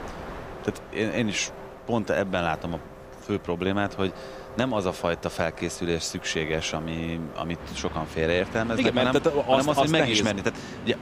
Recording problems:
train or aircraft noise; noticeable; throughout; 15 dB below the speech

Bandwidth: 15 kHz